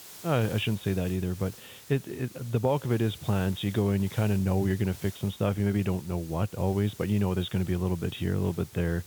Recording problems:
high frequencies cut off; severe; nothing above 4 kHz
hiss; noticeable; throughout; 20 dB below the speech

